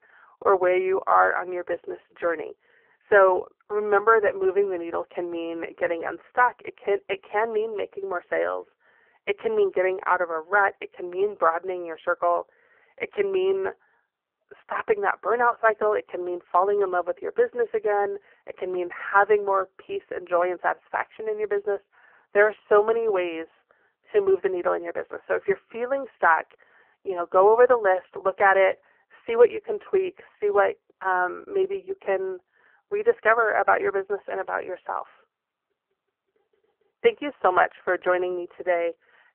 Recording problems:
phone-call audio; poor line
muffled; very; fading above 2.5 kHz

